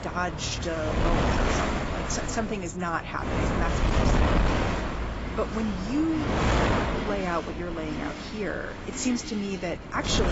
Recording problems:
garbled, watery; badly; nothing above 7.5 kHz
wind noise on the microphone; heavy; 2 dB above the speech
traffic noise; noticeable; throughout; 10 dB below the speech
abrupt cut into speech; at the end

